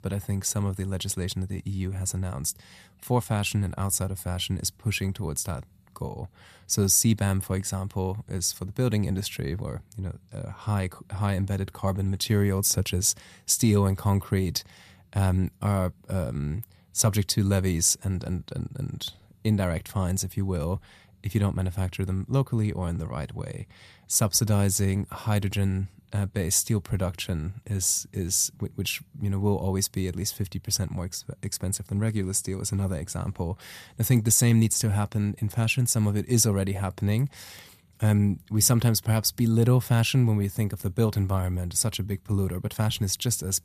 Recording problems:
none

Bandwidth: 14.5 kHz